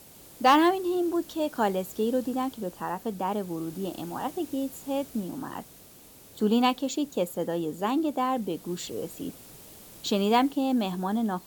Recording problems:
hiss; noticeable; throughout; 20 dB below the speech

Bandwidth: 18.5 kHz